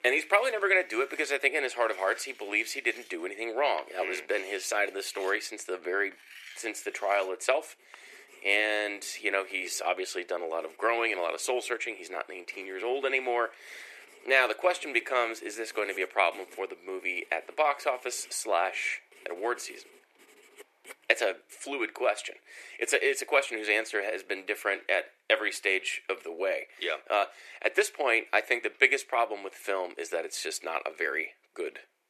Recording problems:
thin; very; fading below 350 Hz
household noises; faint; throughout; 25 dB below the speech
background music; very faint; throughout; 50 dB below the speech

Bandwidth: 13.5 kHz